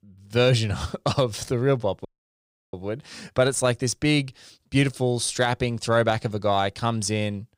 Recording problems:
audio cutting out; at 2 s for 0.5 s

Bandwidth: 15.5 kHz